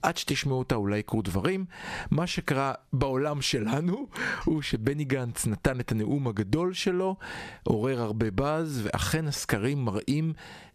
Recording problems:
squashed, flat; somewhat

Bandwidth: 14.5 kHz